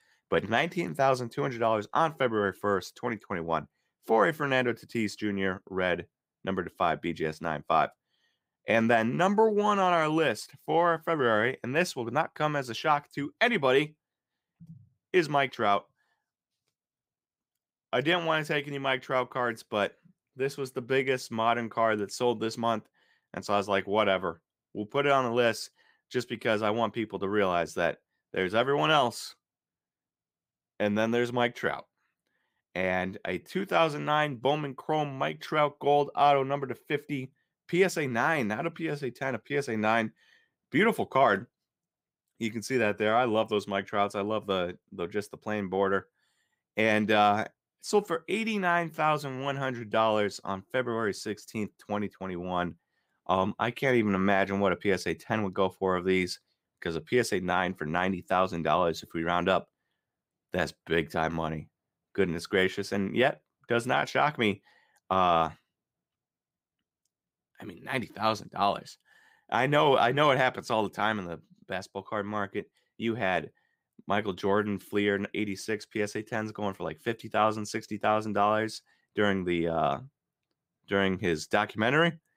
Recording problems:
none

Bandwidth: 15.5 kHz